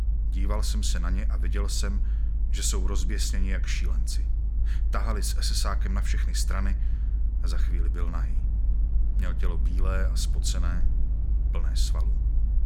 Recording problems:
low rumble; noticeable; throughout; 15 dB below the speech

